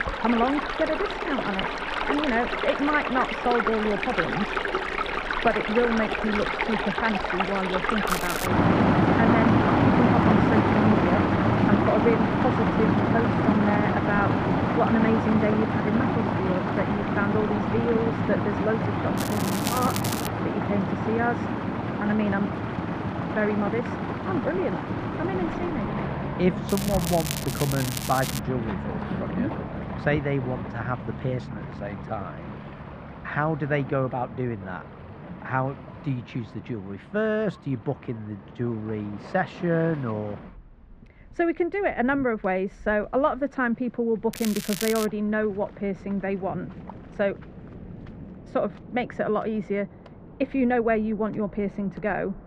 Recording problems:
muffled; very; fading above 1.5 kHz
rain or running water; very loud; throughout; 2 dB above the speech
crackling; loud; 4 times, first at 8 s; 6 dB below the speech

